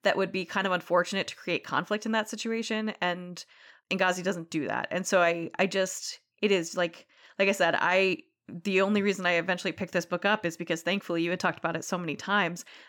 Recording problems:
none

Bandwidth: 18 kHz